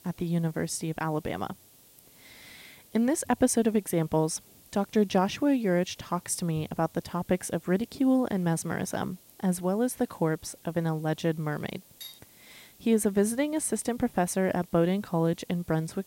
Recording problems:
hiss; faint; throughout; 25 dB below the speech
clattering dishes; faint; at 12 s; peak 15 dB below the speech

